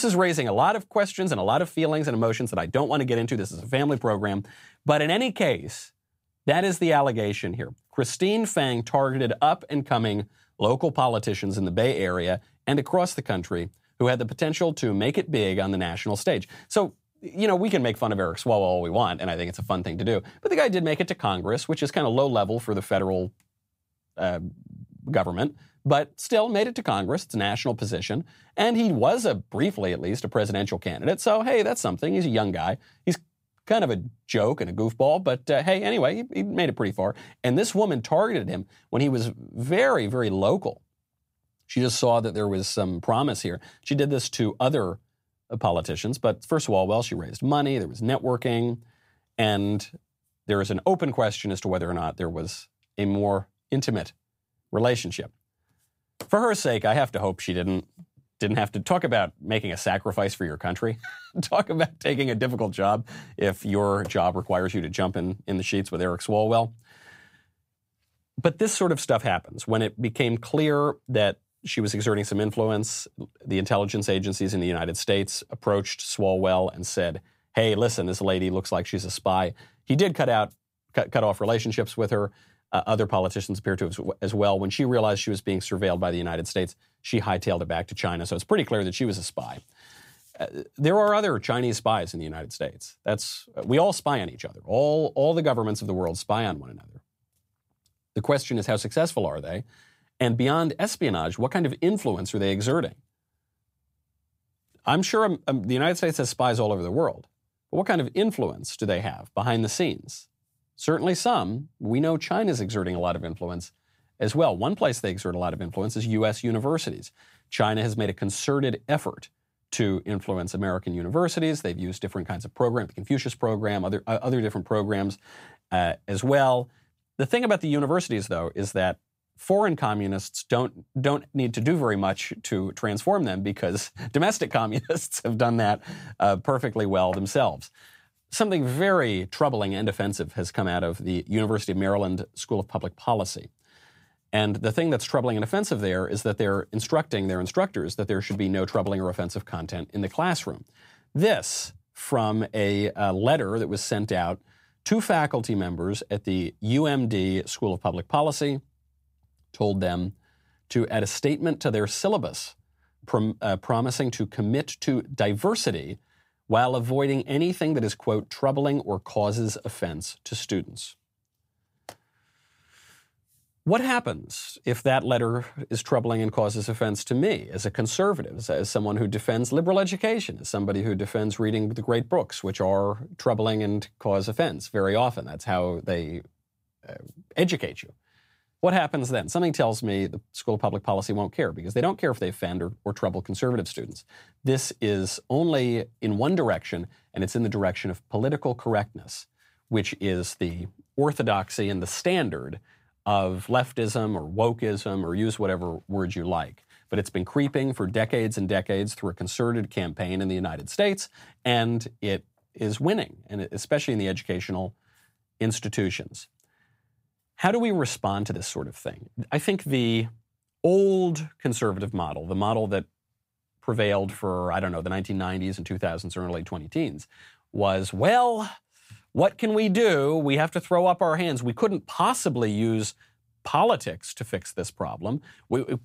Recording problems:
abrupt cut into speech; at the start

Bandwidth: 15.5 kHz